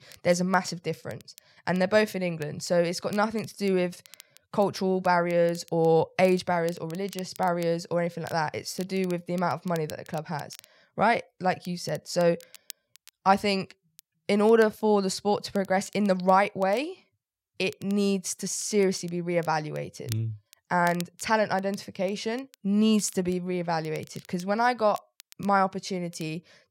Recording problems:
crackle, like an old record; faint; 25 dB below the speech

